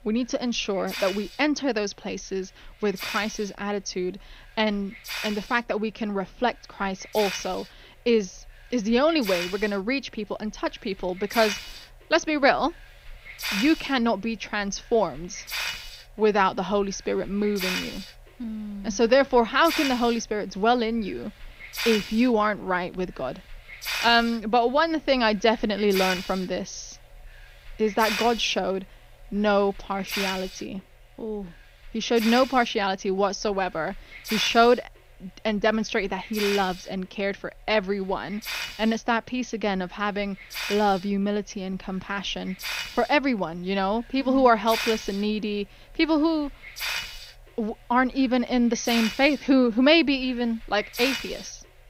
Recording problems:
high frequencies cut off; noticeable; nothing above 6.5 kHz
hiss; loud; throughout; 7 dB below the speech

